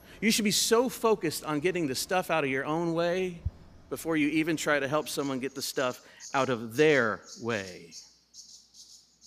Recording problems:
animal sounds; faint; throughout; 20 dB below the speech

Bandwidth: 15 kHz